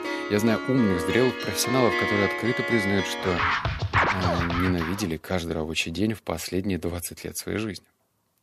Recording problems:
background music; loud; until 4.5 s; as loud as the speech

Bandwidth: 14.5 kHz